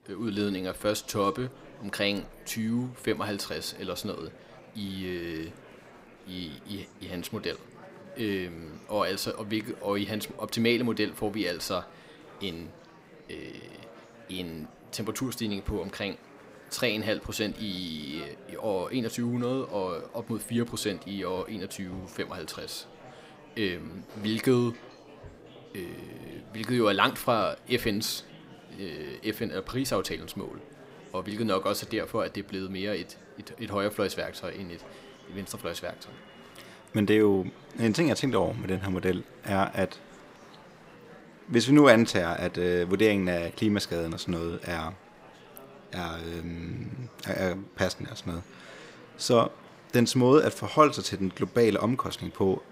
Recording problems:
murmuring crowd; faint; throughout; 20 dB below the speech

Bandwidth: 15.5 kHz